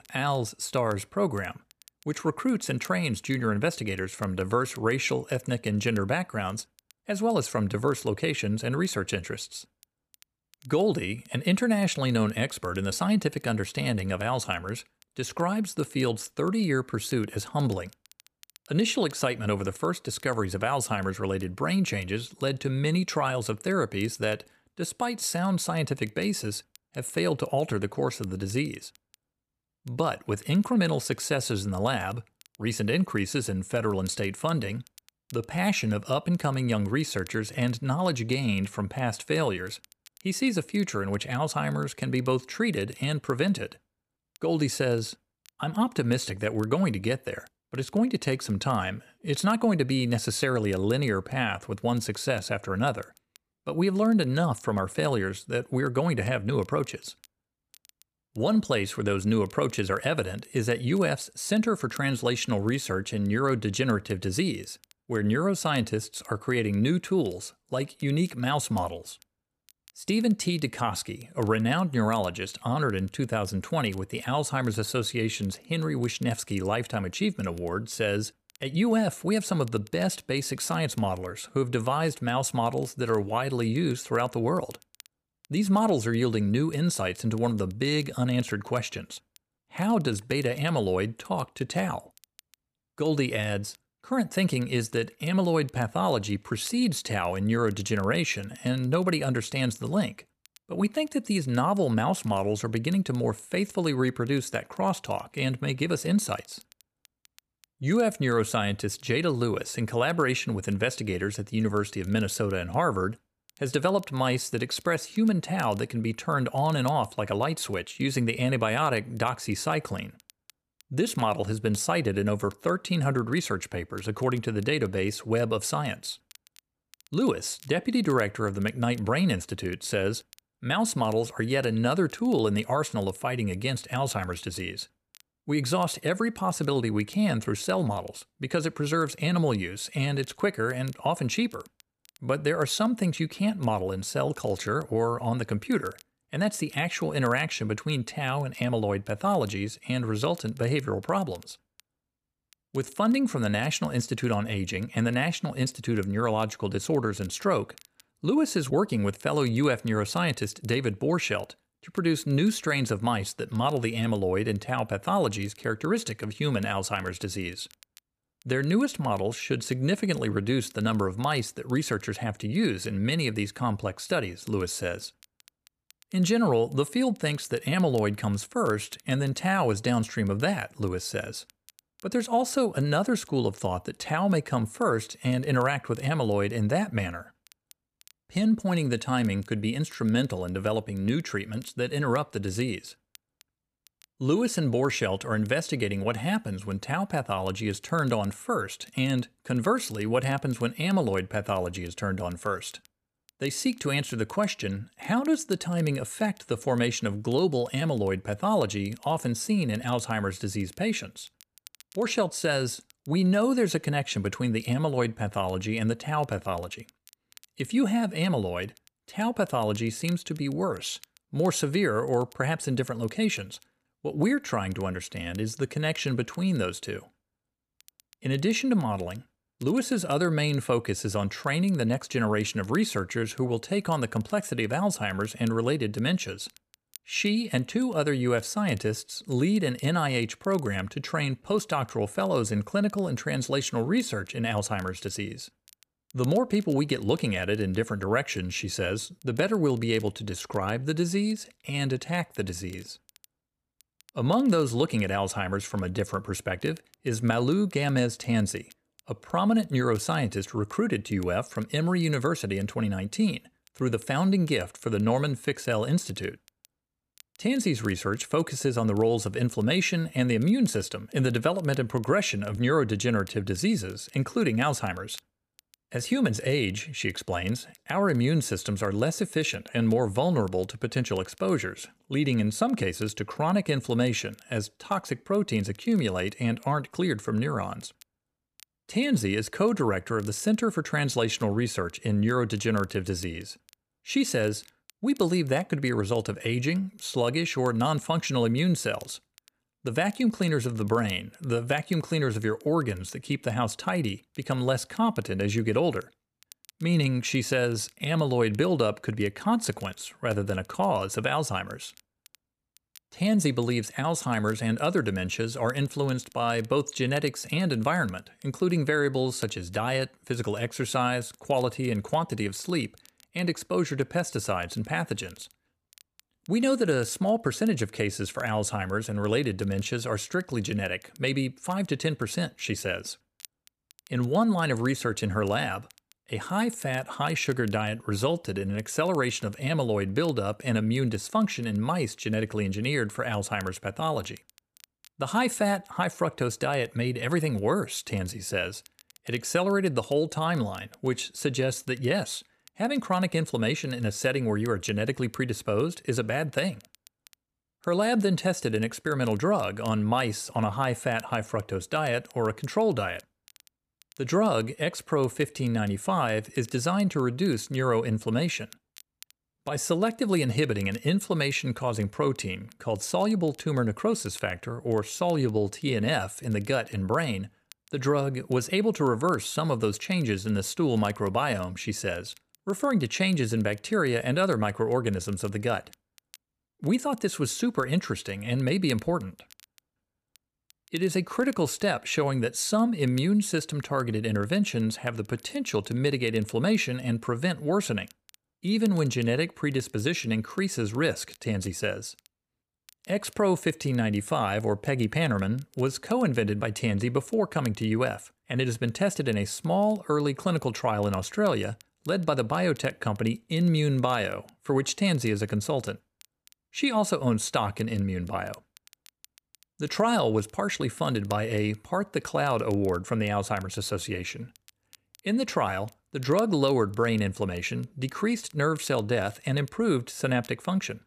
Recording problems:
crackle, like an old record; faint; 30 dB below the speech

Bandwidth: 14.5 kHz